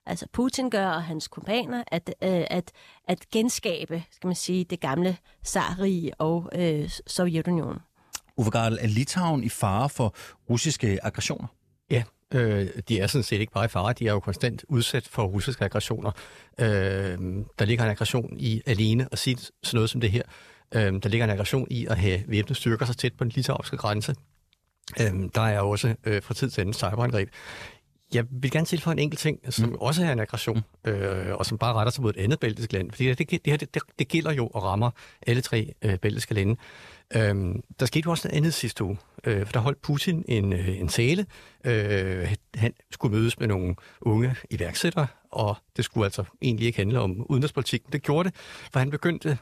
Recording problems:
none

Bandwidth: 14.5 kHz